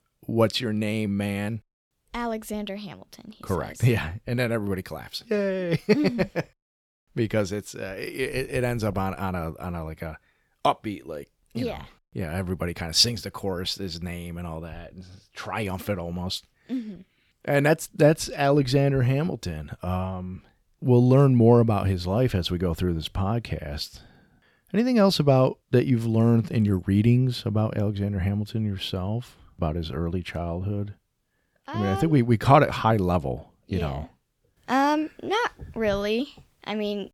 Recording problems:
none

